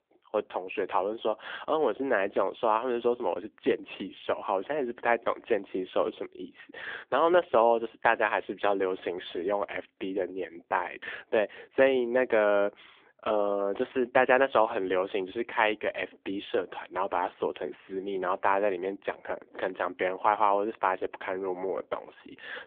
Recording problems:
phone-call audio; nothing above 3.5 kHz

